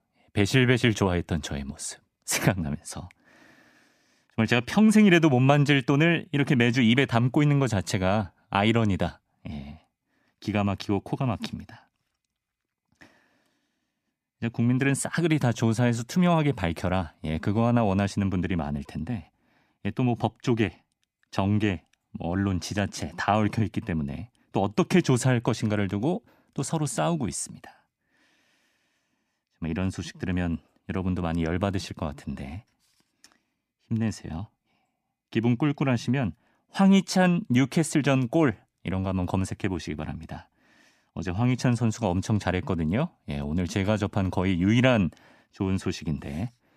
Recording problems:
none

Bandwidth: 14.5 kHz